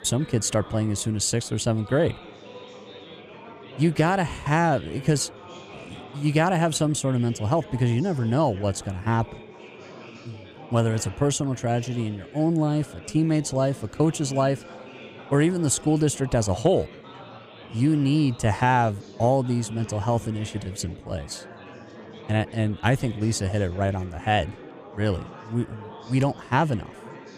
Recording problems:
chatter from many people; noticeable; throughout; 20 dB below the speech

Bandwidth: 14.5 kHz